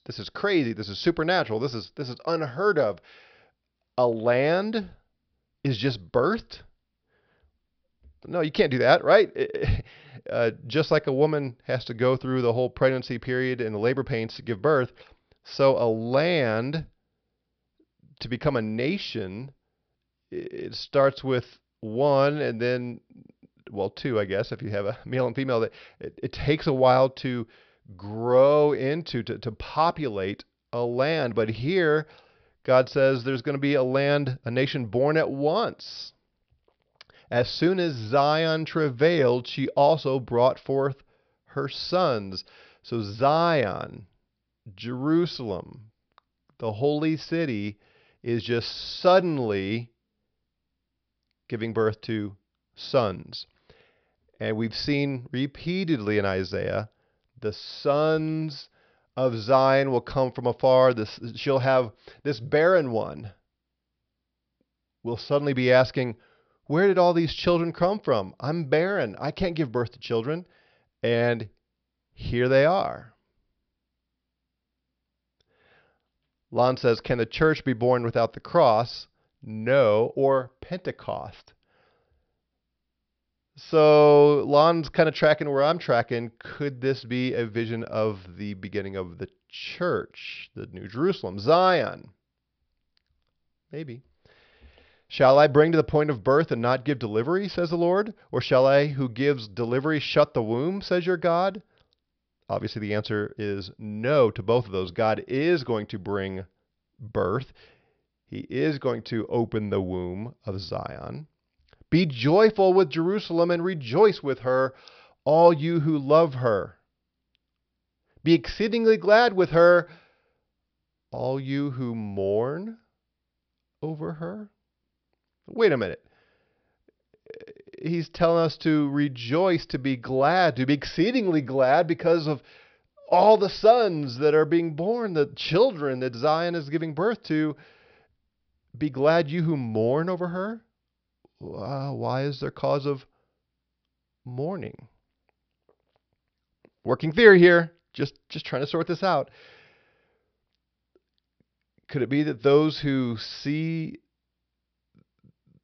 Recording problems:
high frequencies cut off; noticeable; nothing above 5.5 kHz

